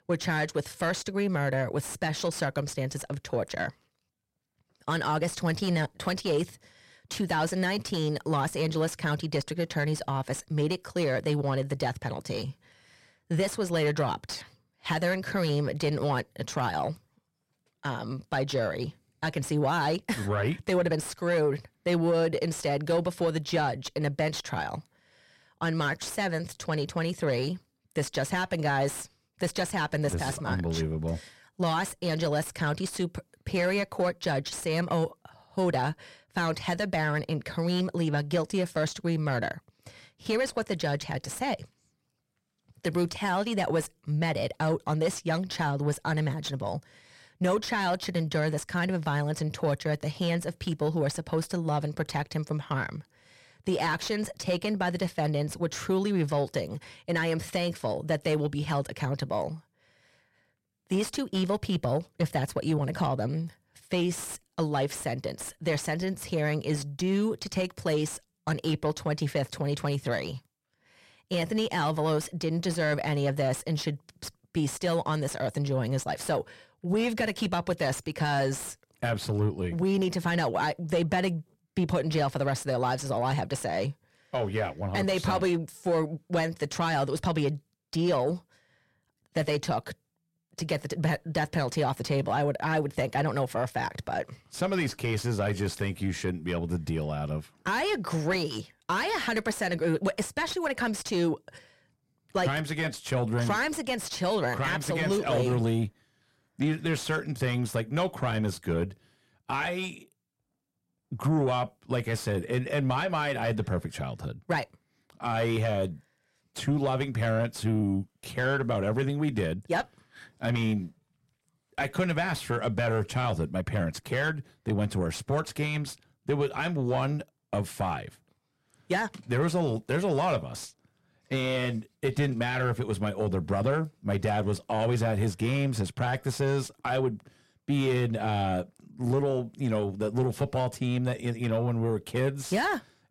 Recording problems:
distortion; slight; 10 dB below the speech

